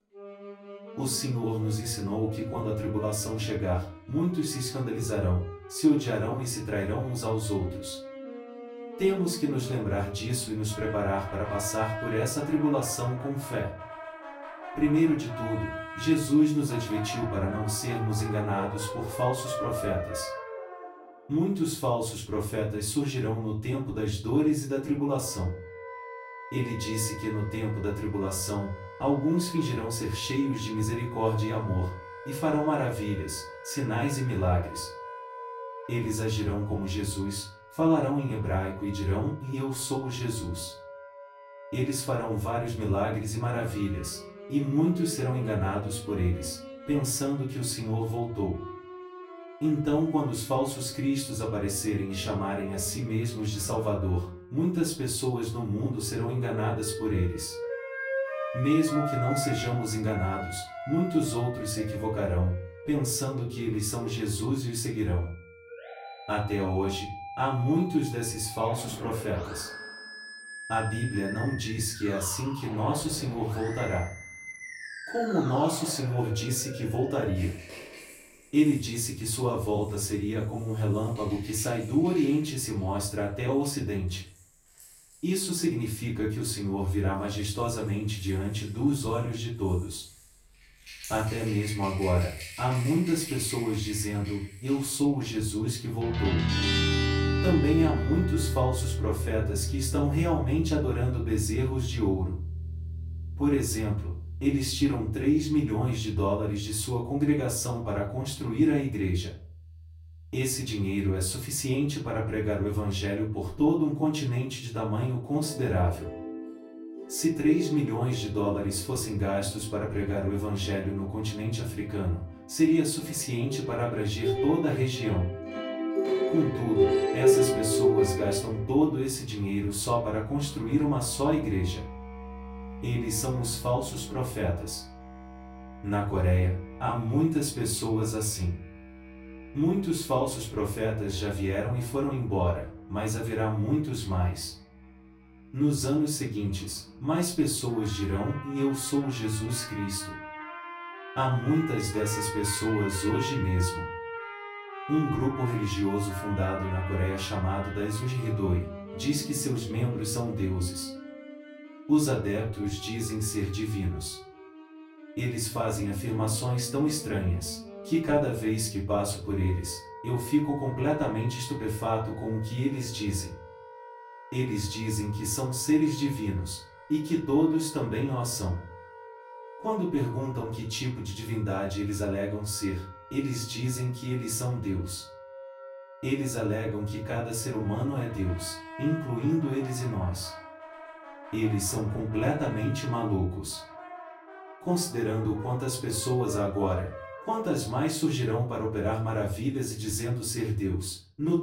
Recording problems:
off-mic speech; far
room echo; slight; dies away in 0.3 s
background music; loud; throughout; 8 dB below the speech

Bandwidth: 16 kHz